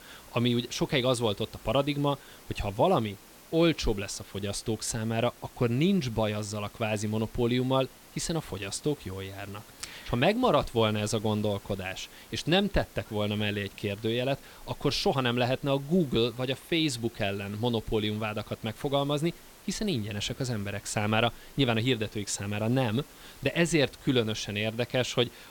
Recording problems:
hiss; faint; throughout; 20 dB below the speech

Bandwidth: 17.5 kHz